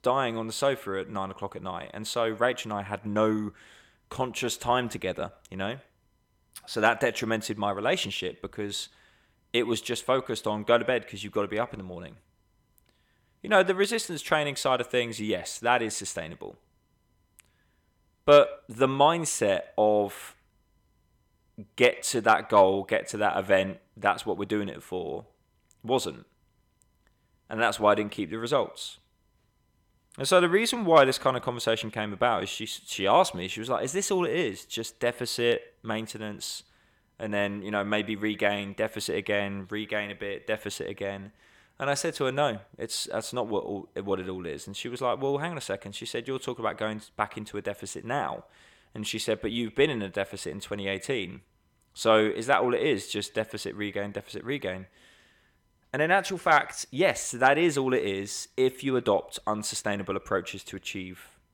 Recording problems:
echo of what is said; faint; throughout; 100 ms later, 25 dB below the speech

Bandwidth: 17.5 kHz